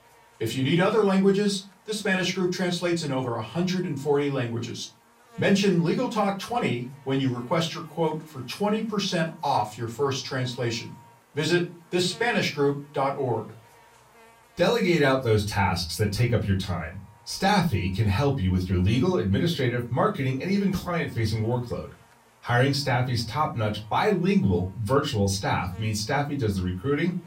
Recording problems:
off-mic speech; far
room echo; very slight; dies away in 0.3 s
electrical hum; faint; throughout; 60 Hz, 25 dB below the speech

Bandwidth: 16 kHz